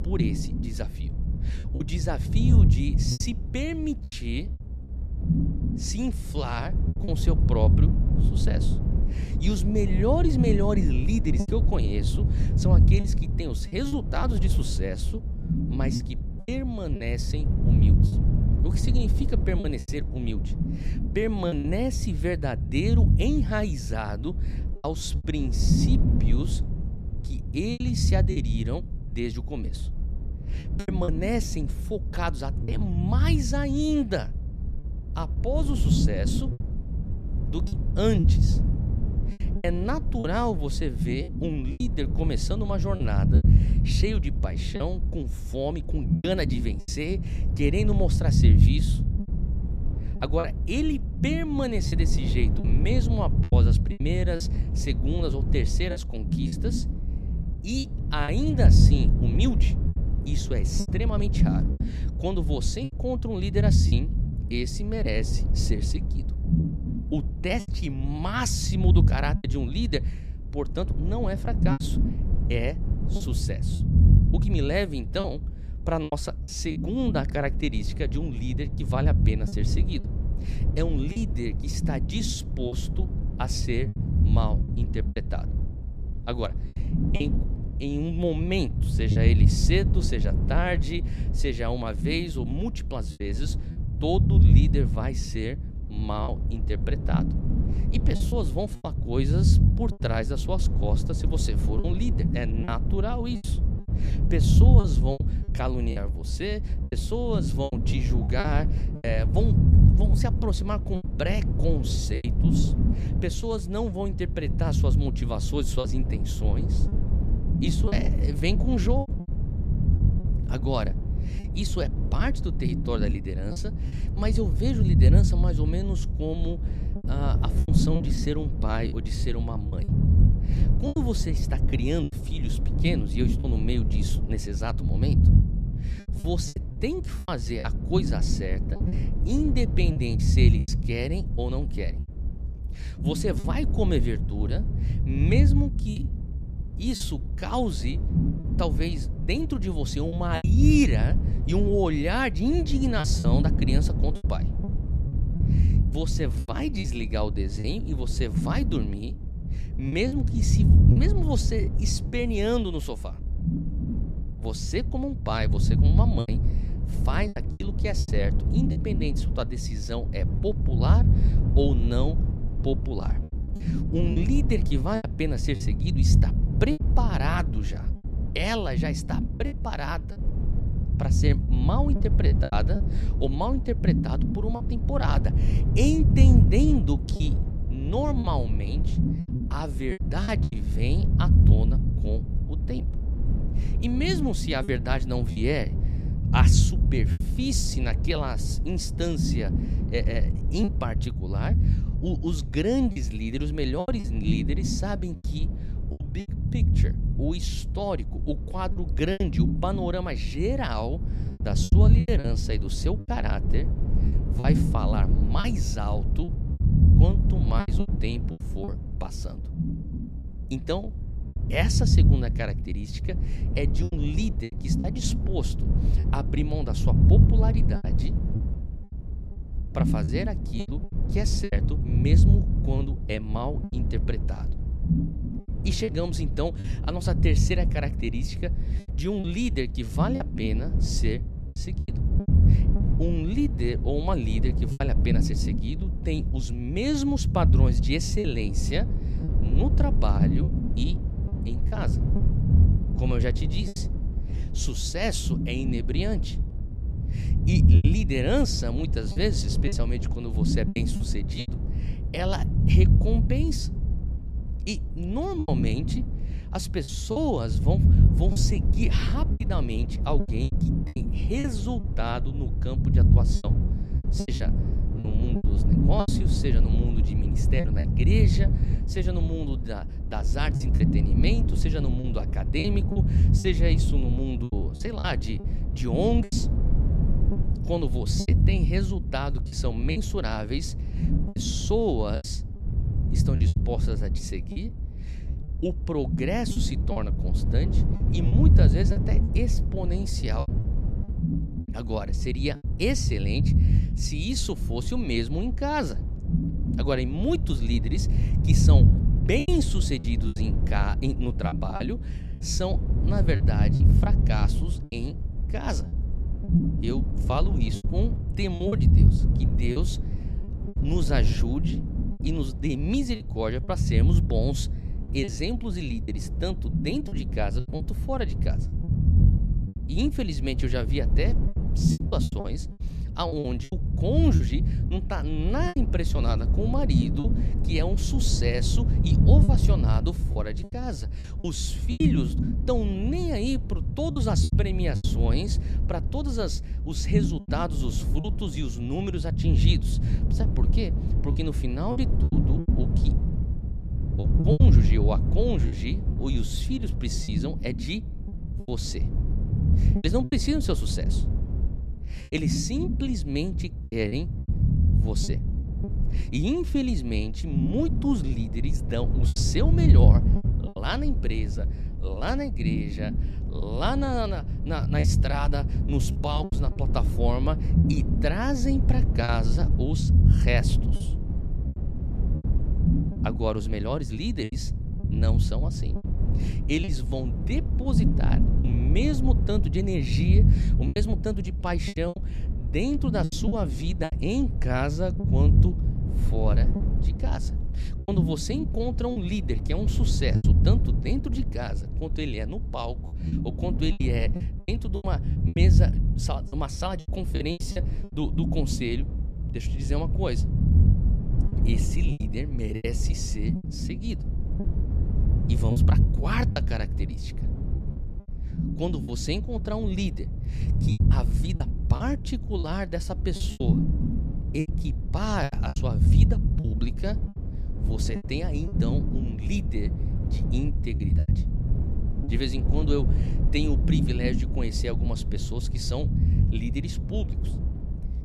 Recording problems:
low rumble; loud; throughout; 6 dB below the speech
choppy; very; 6% of the speech affected

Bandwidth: 14 kHz